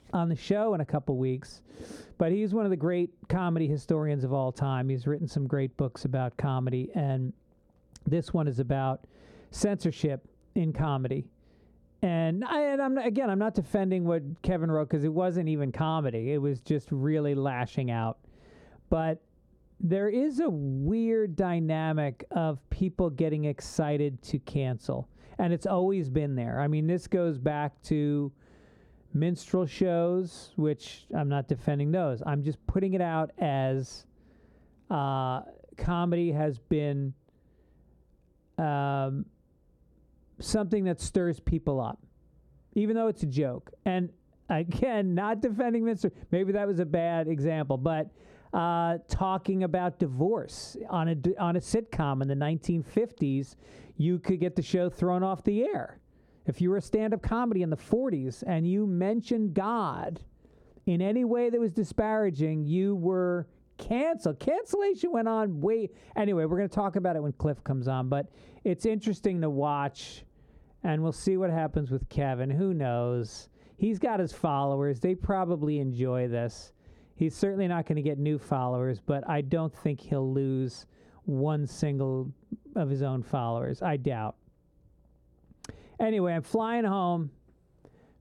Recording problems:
squashed, flat; heavily
muffled; very slightly; fading above 1 kHz

